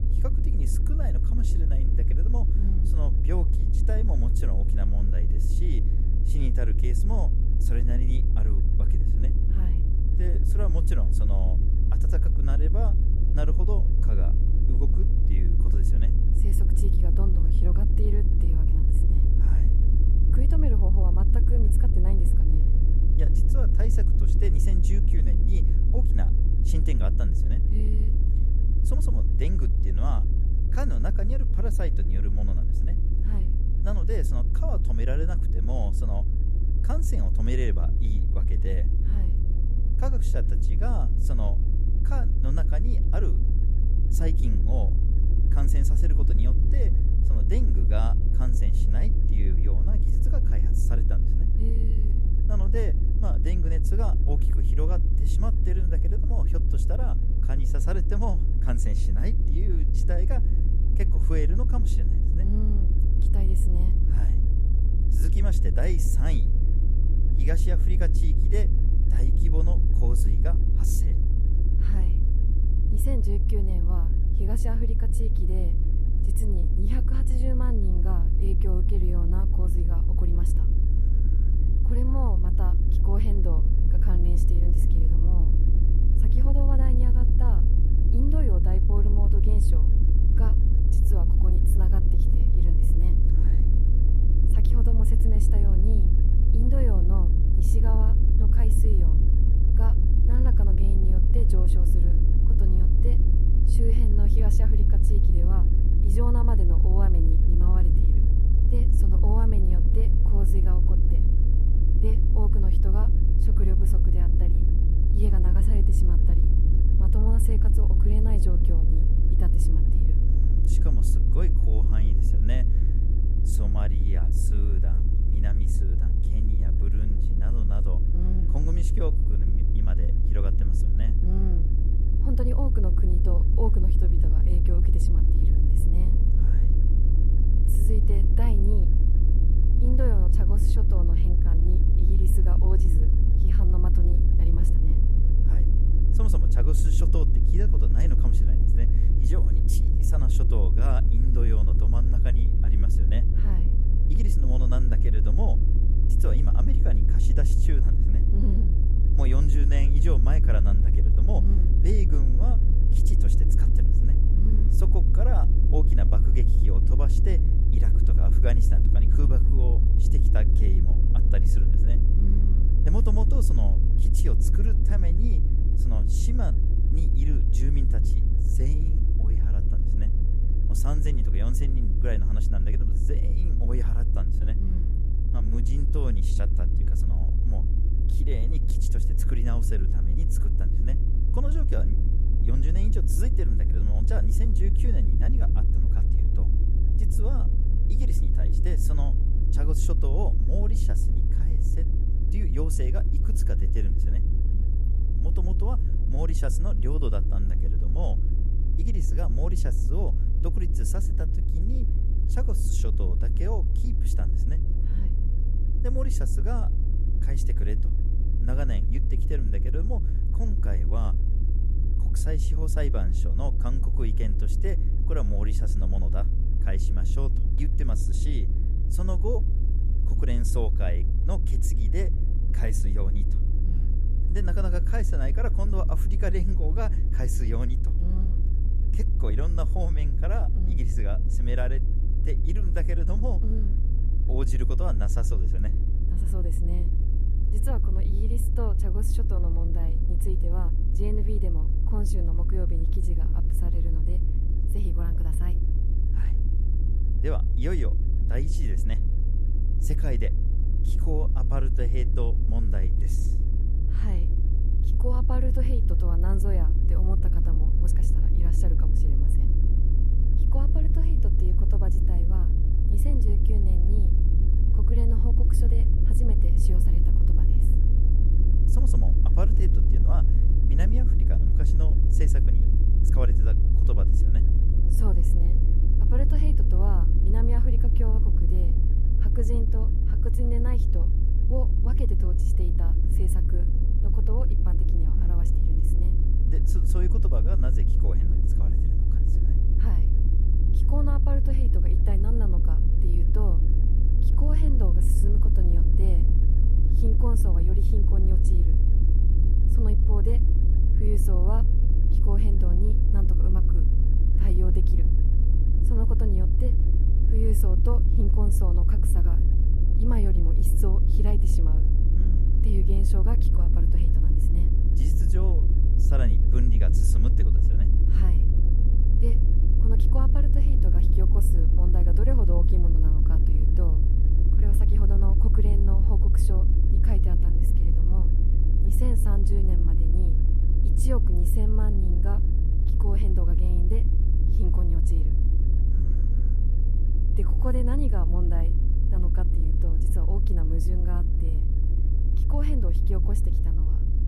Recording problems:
low rumble; loud; throughout; 2 dB below the speech

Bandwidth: 14.5 kHz